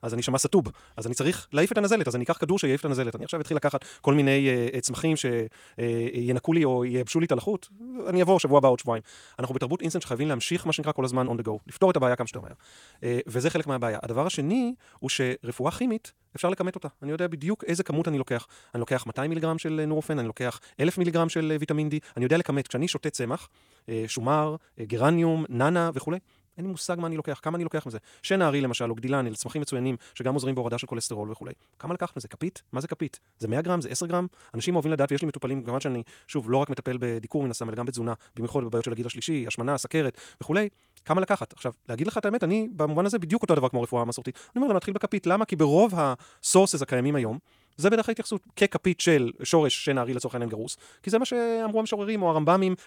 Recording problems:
wrong speed, natural pitch; too fast; 1.5 times normal speed

